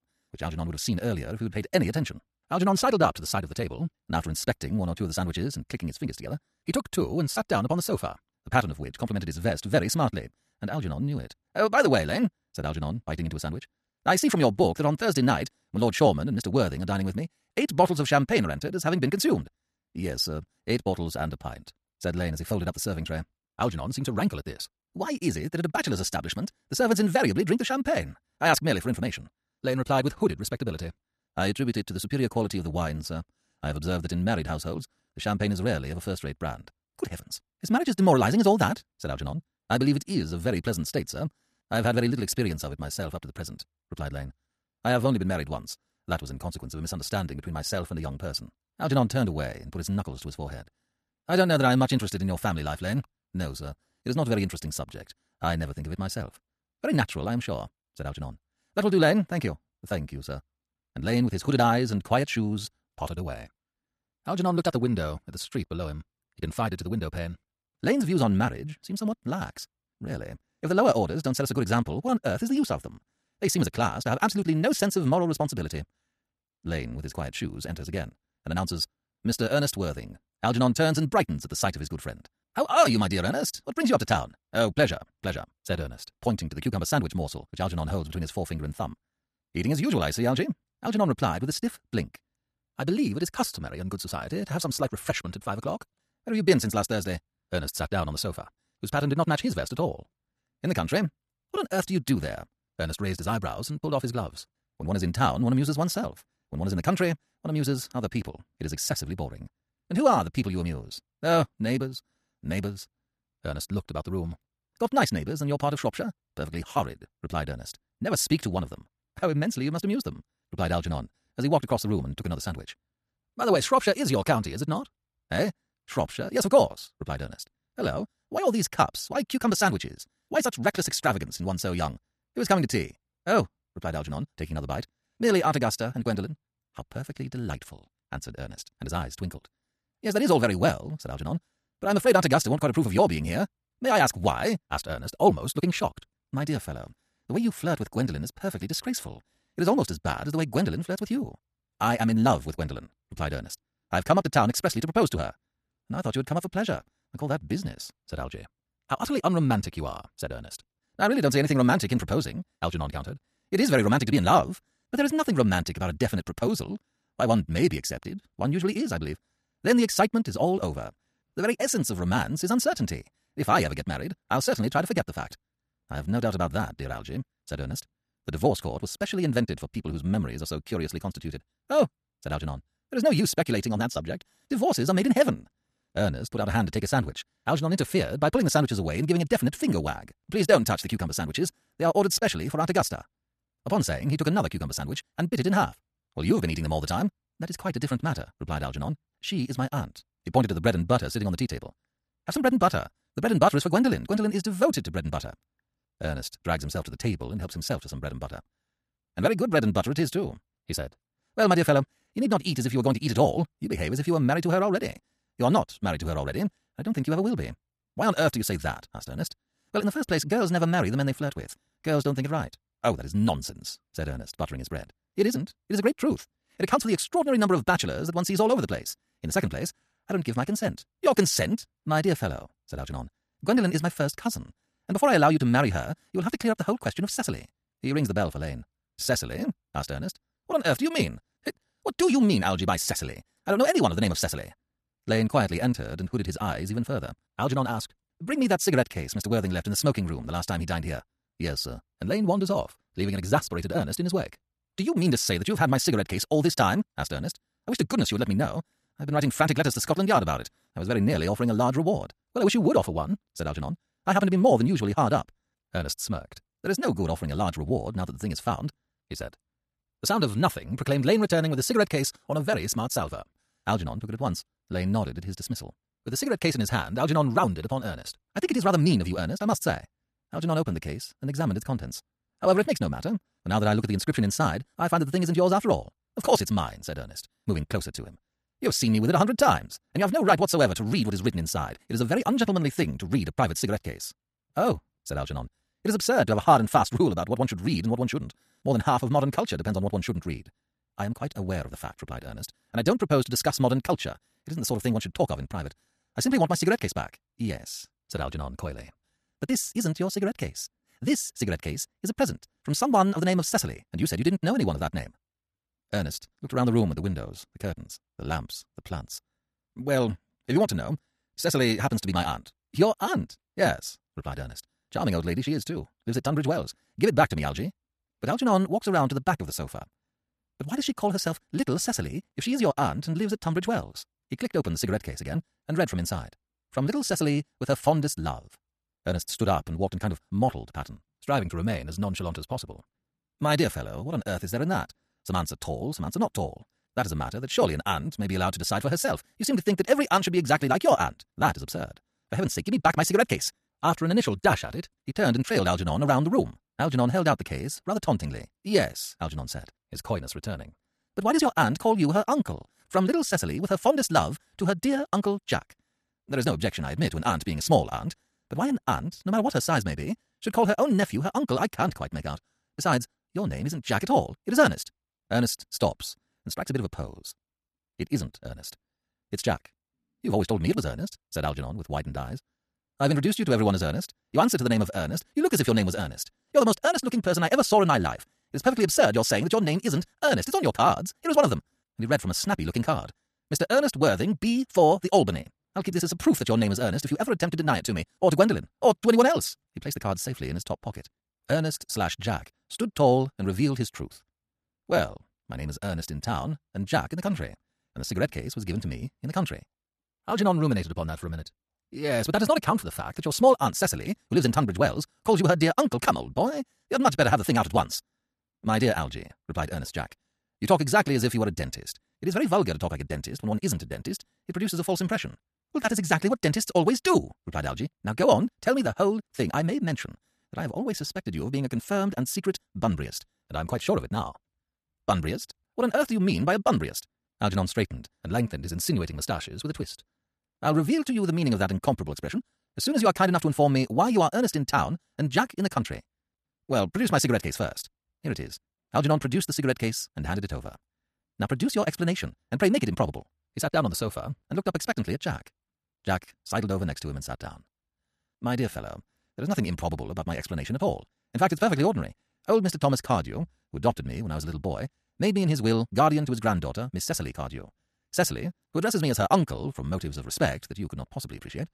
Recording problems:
wrong speed, natural pitch; too fast; 1.7 times normal speed

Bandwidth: 14 kHz